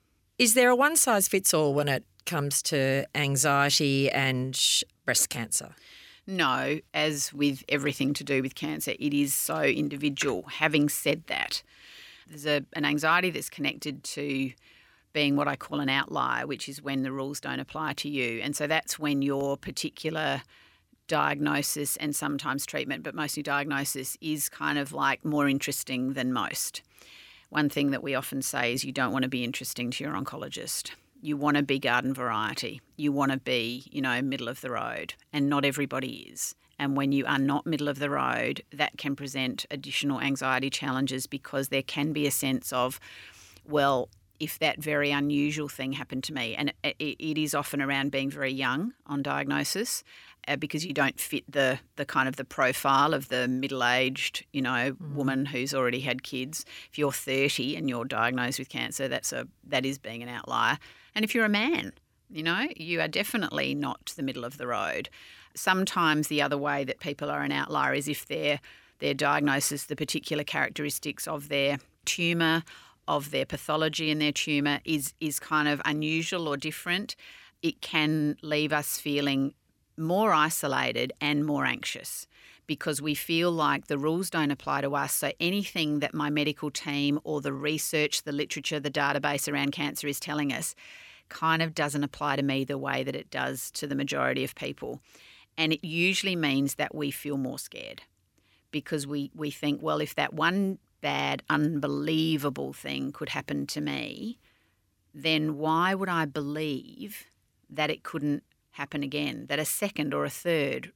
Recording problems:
none

